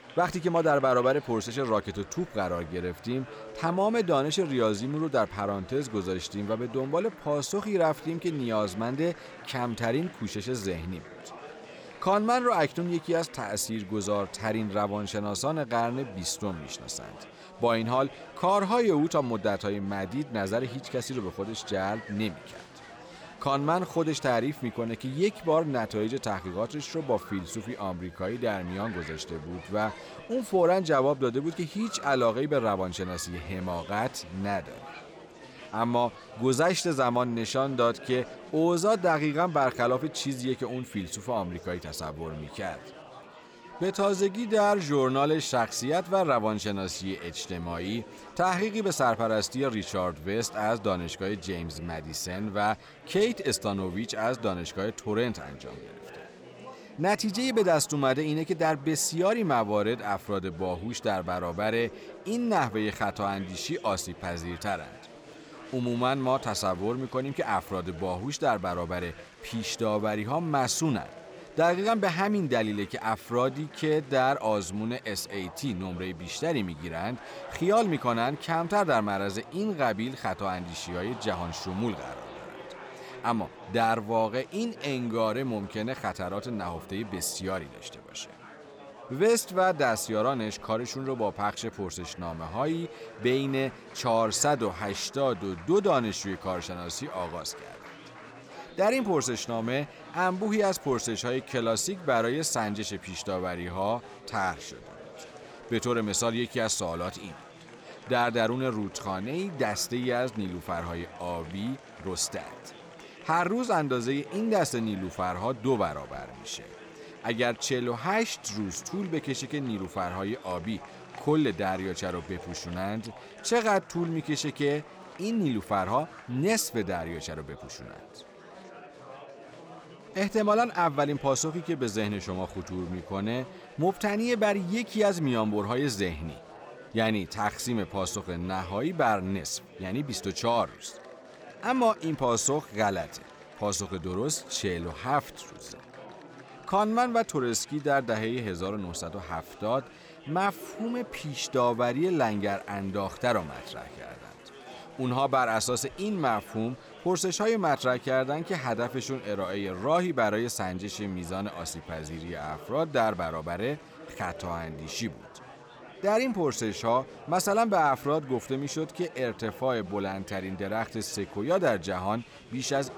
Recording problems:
chatter from many people; noticeable; throughout; 20 dB below the speech

